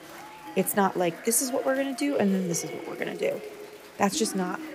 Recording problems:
chatter from many people; noticeable; throughout; 15 dB below the speech

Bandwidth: 15.5 kHz